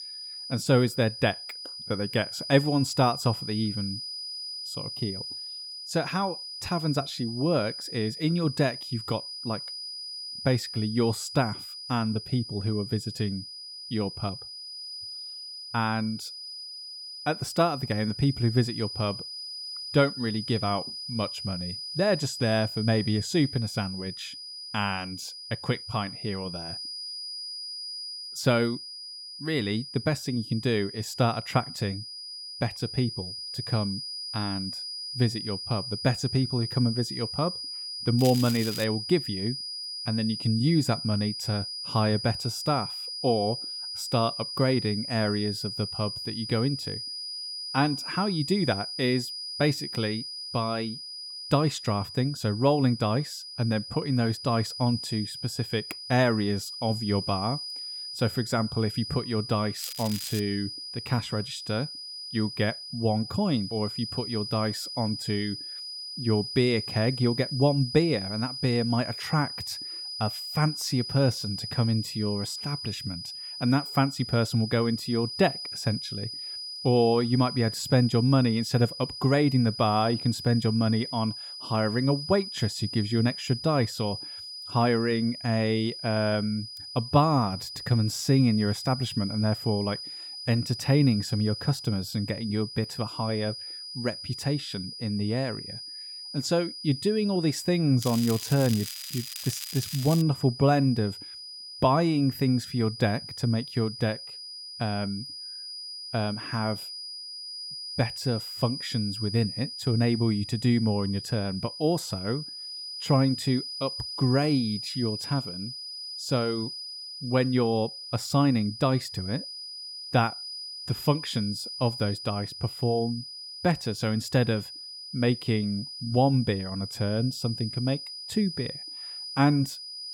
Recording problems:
high-pitched whine; loud; throughout; 5 kHz, 8 dB below the speech
crackling; loud; at 38 s, at 1:00 and from 1:38 to 1:40; 10 dB below the speech

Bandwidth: 17 kHz